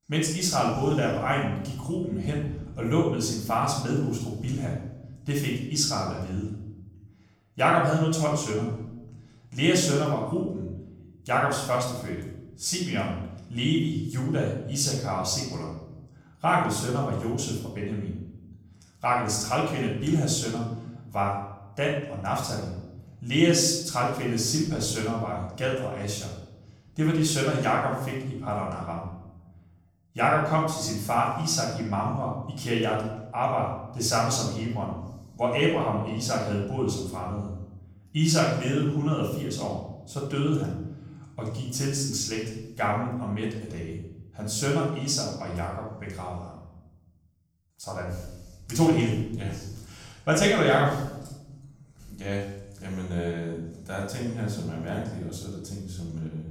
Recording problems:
off-mic speech; far
room echo; noticeable; dies away in 0.9 s

